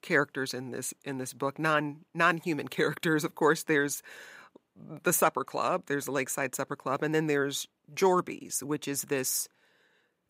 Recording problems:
none

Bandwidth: 15.5 kHz